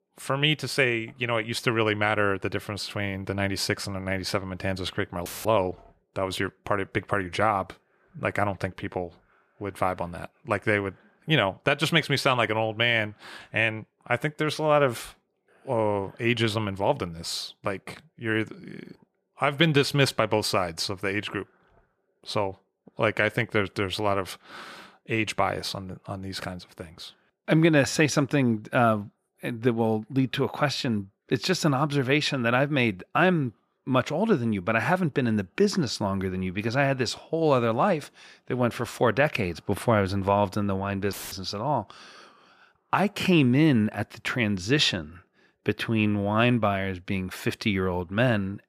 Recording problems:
audio cutting out; filled with static; at 5.5 s and at 41 s

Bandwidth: 14.5 kHz